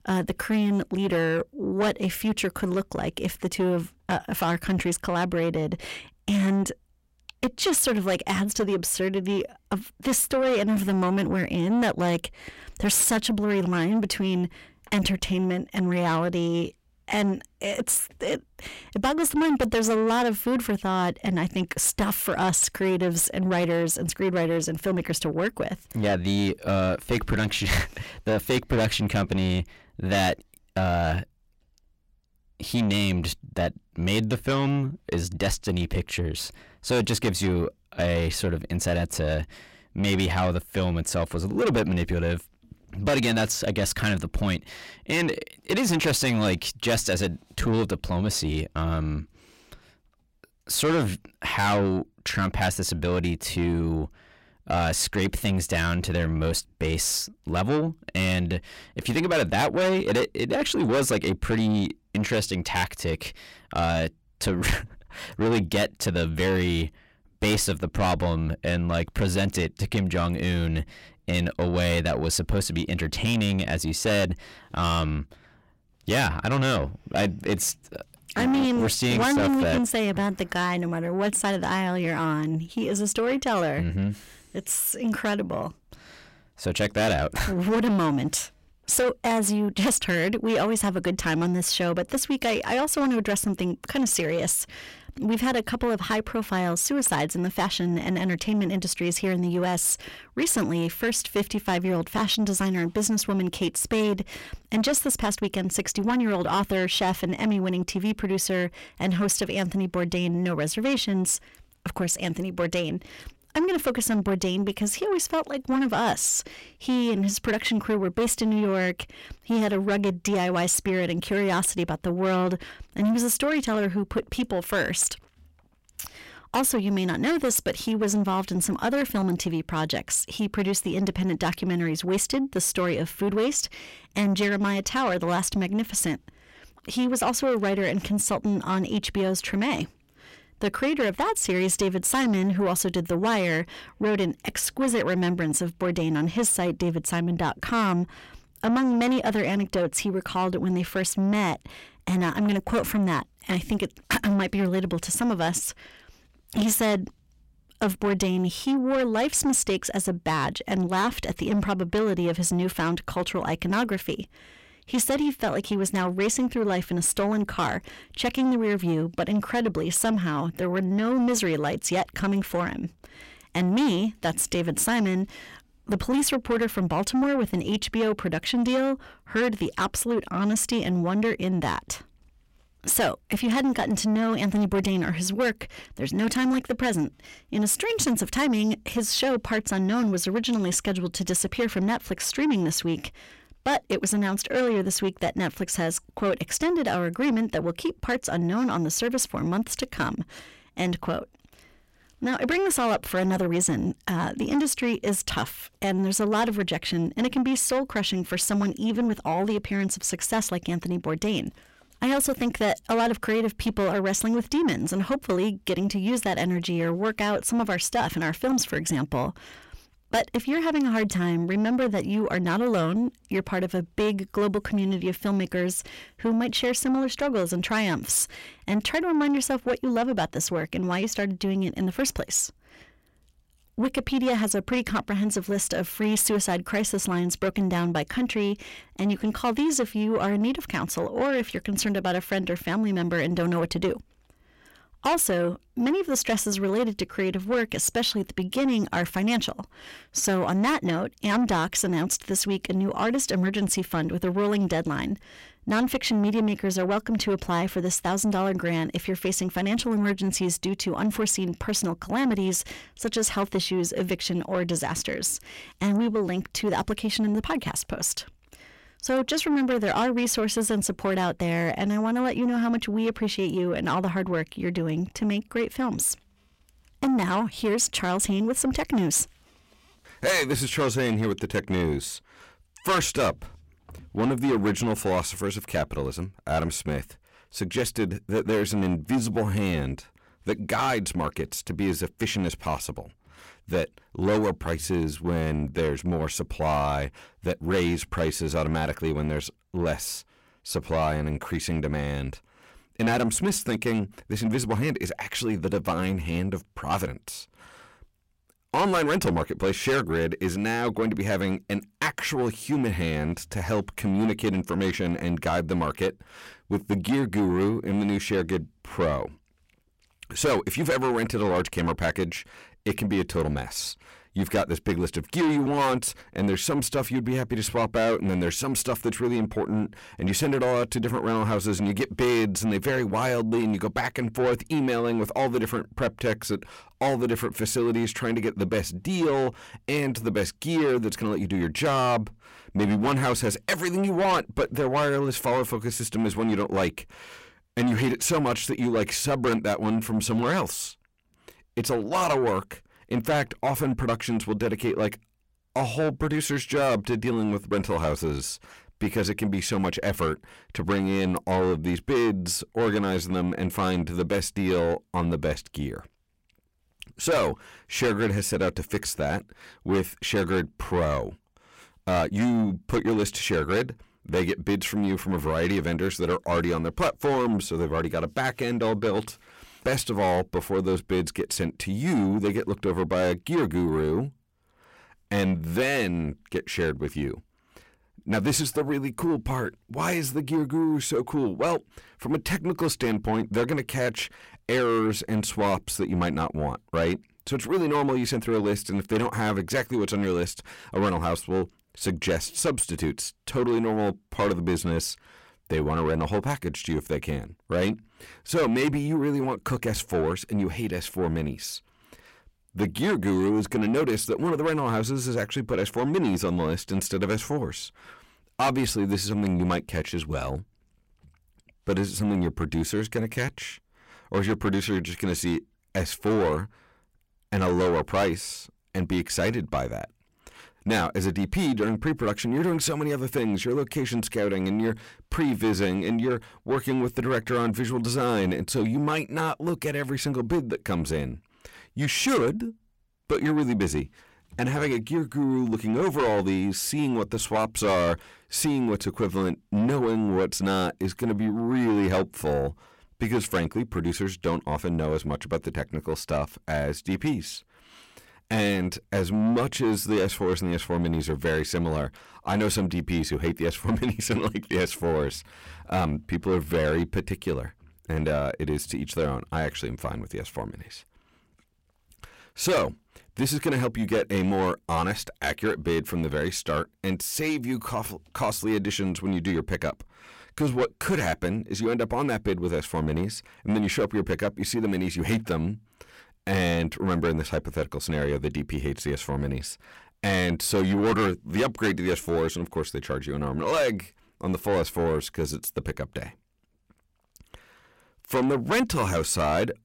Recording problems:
distortion; heavy; 8 dB below the speech

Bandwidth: 16 kHz